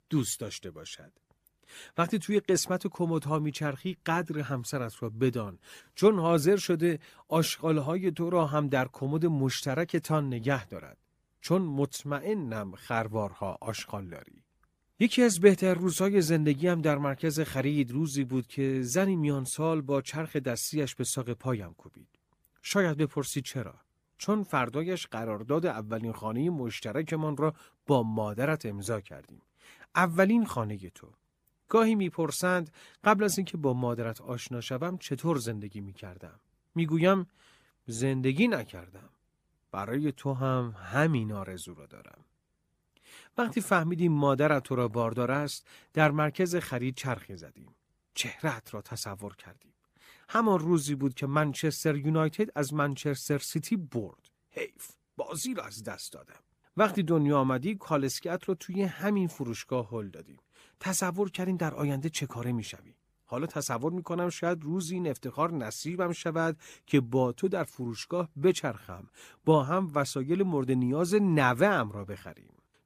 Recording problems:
none

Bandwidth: 15 kHz